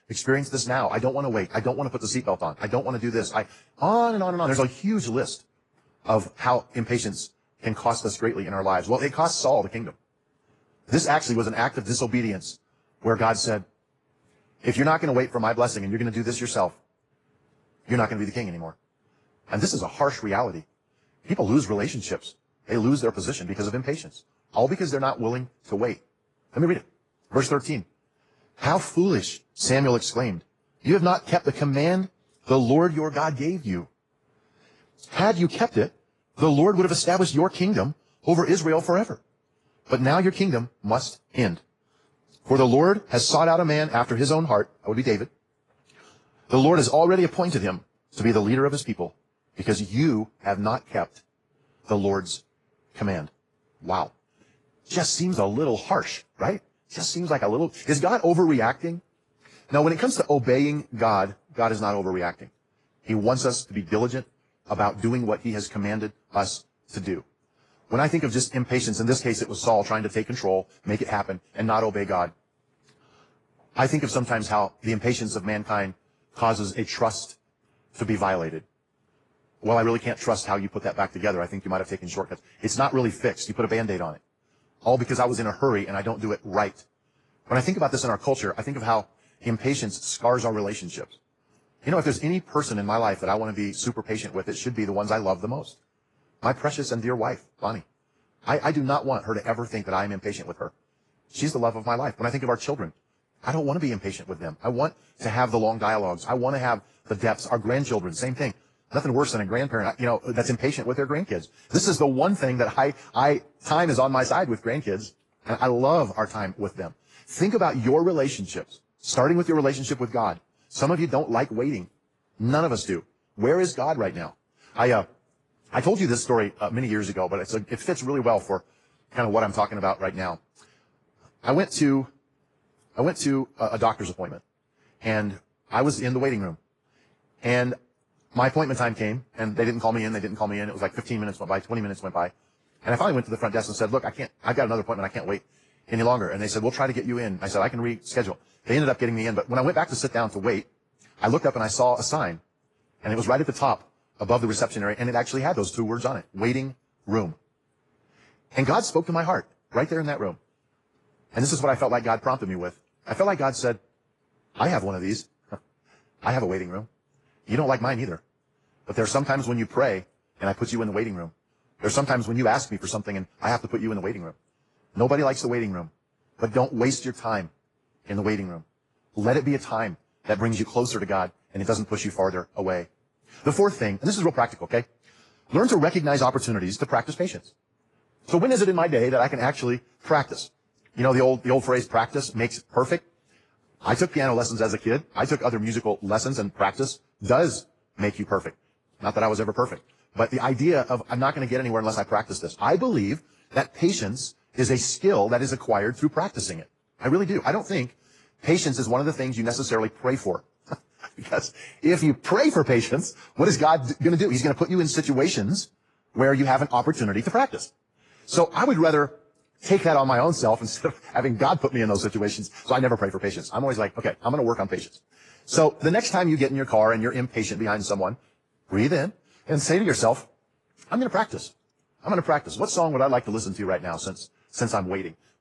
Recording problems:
wrong speed, natural pitch; too fast; 1.6 times normal speed
garbled, watery; slightly

